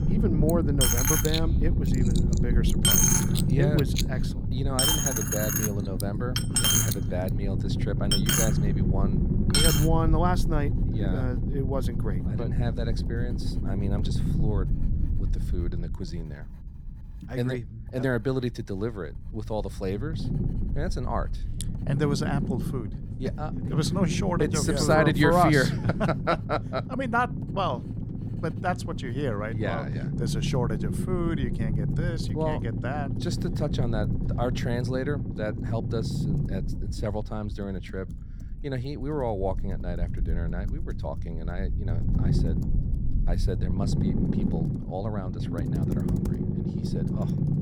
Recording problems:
household noises; very loud; throughout; 4 dB above the speech
low rumble; loud; throughout; 7 dB below the speech

